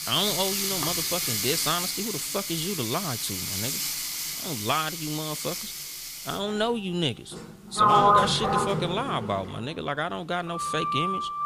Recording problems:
household noises; very loud; throughout; 3 dB above the speech

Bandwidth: 15 kHz